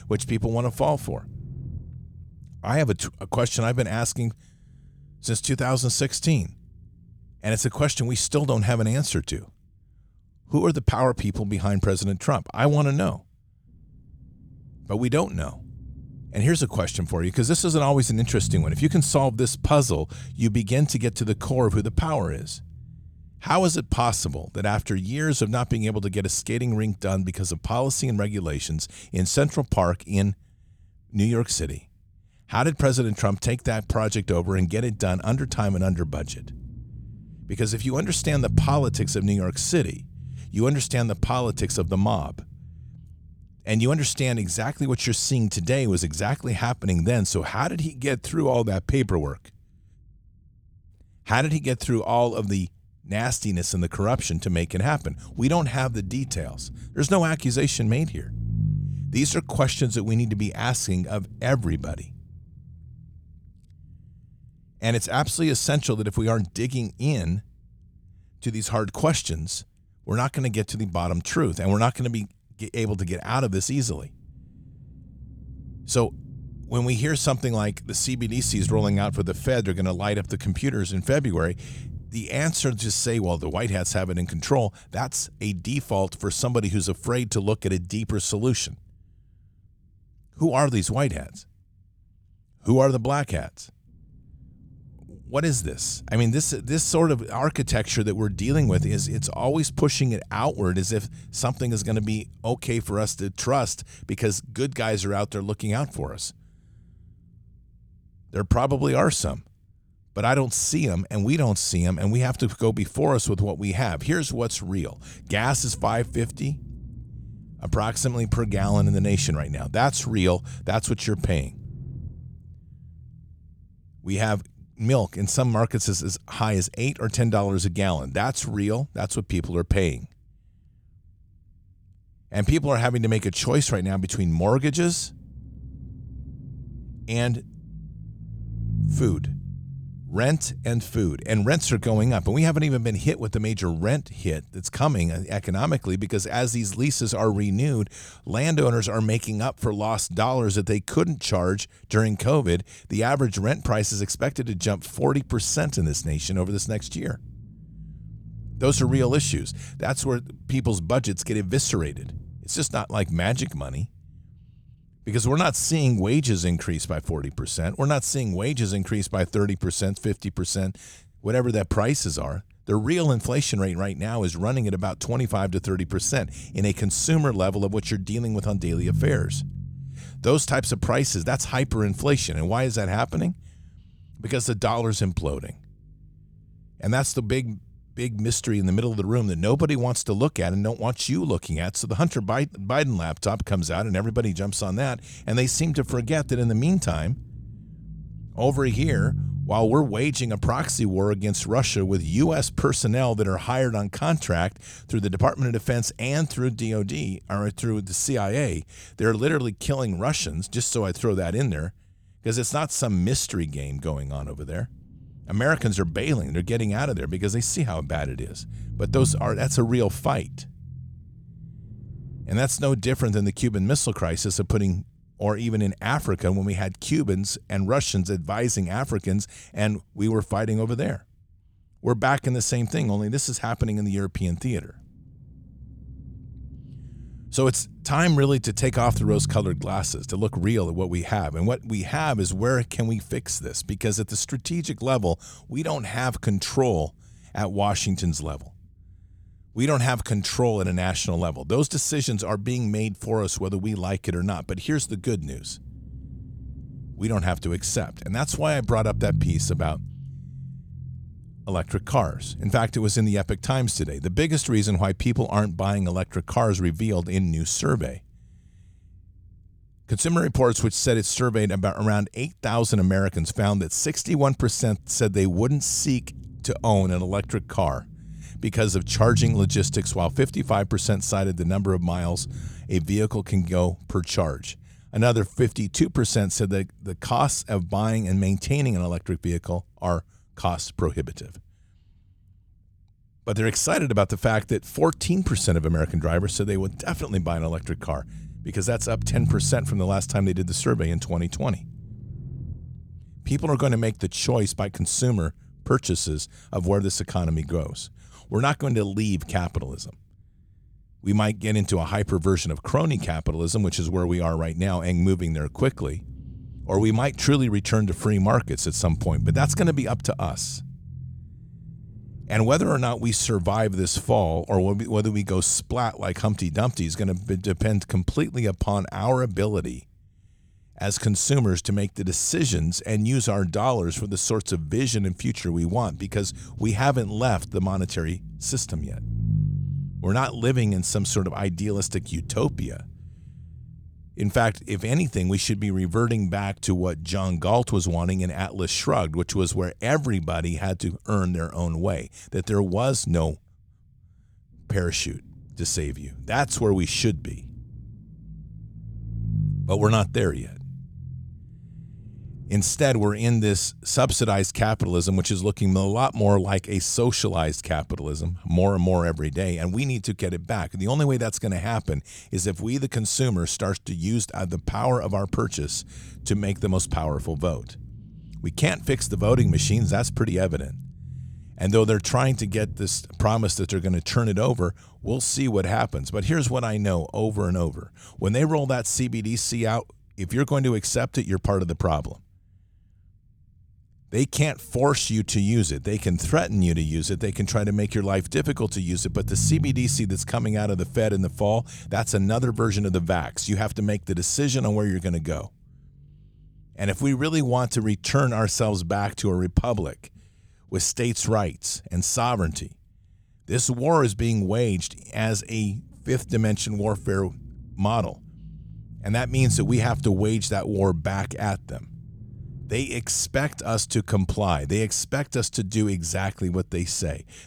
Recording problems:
low rumble; faint; throughout; 20 dB below the speech

